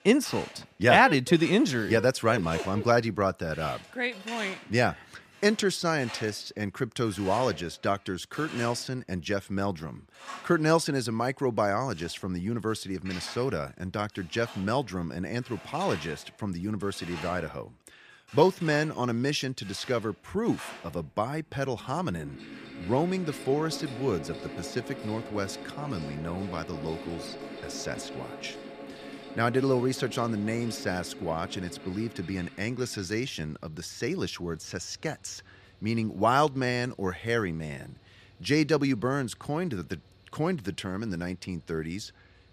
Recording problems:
machinery noise; noticeable; throughout; 15 dB below the speech

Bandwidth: 14.5 kHz